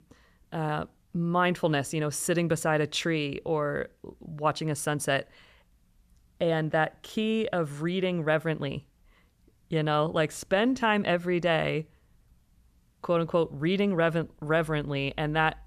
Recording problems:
none

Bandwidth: 14.5 kHz